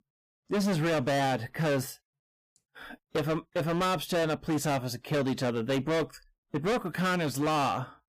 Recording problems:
distortion; heavy; 21% of the sound clipped

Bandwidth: 15 kHz